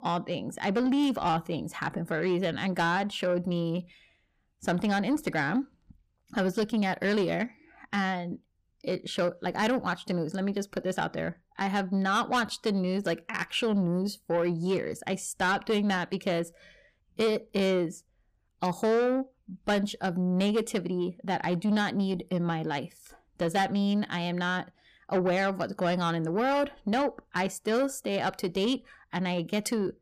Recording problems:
distortion; slight; 10 dB below the speech

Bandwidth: 15 kHz